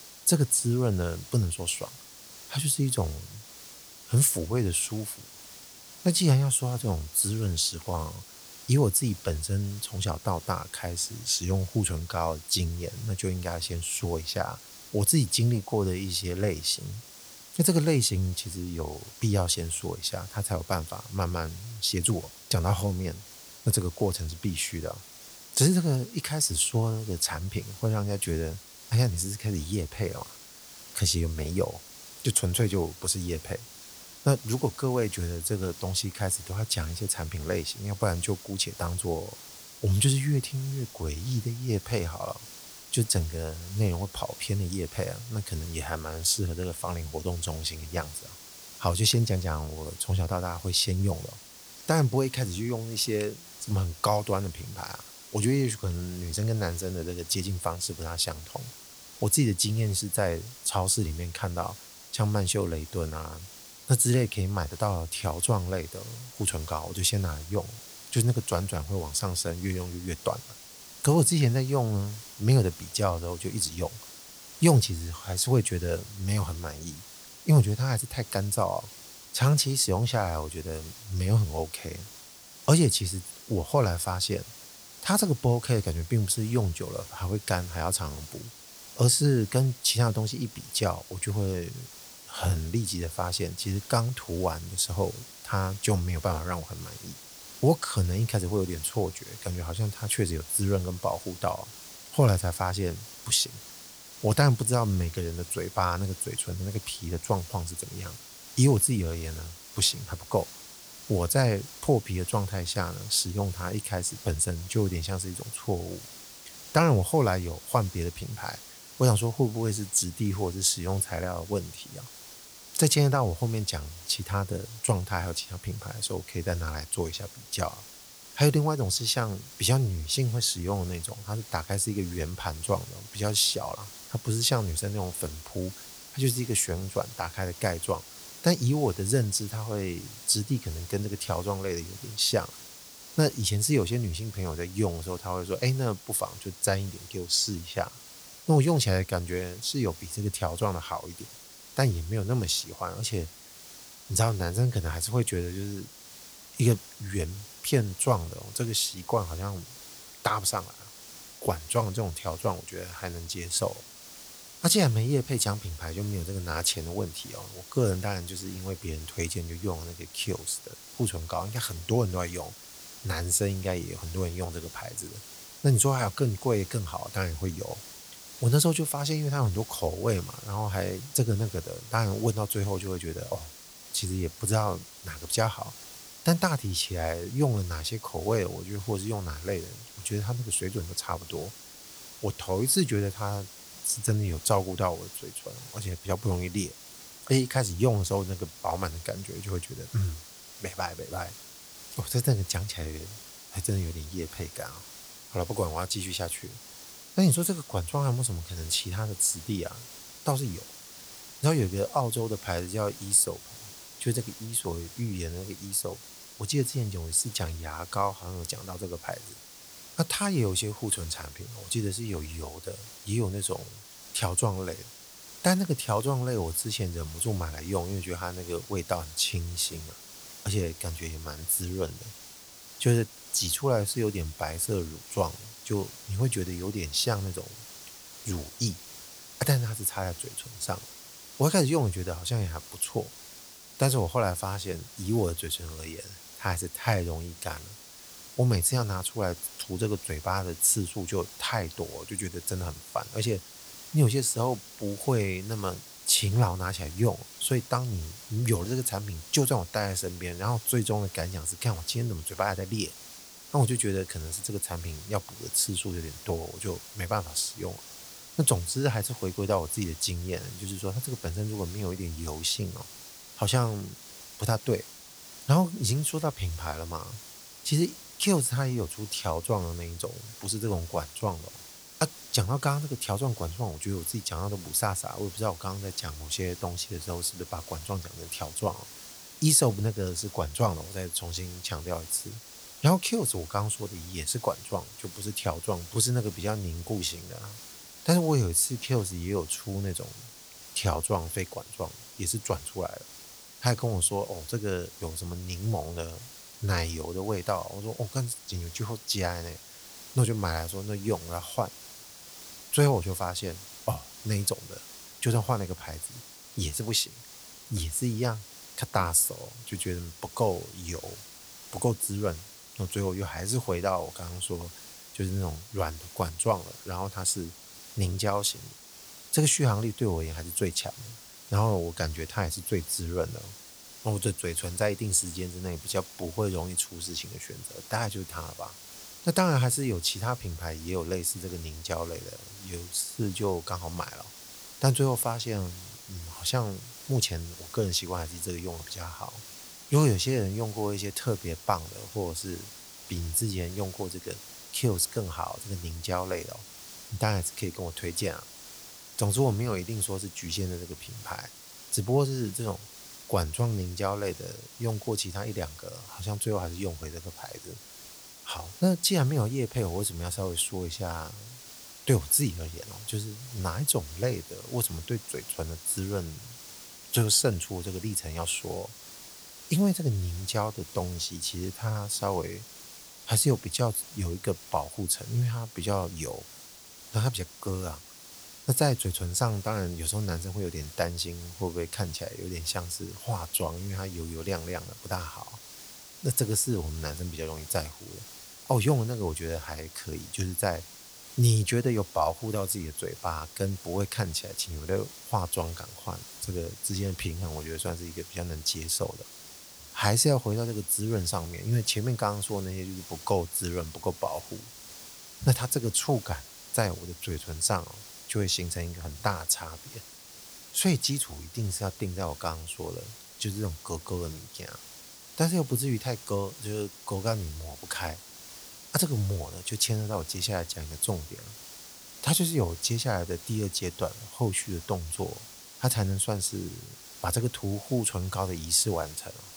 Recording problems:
hiss; noticeable; throughout; 15 dB below the speech

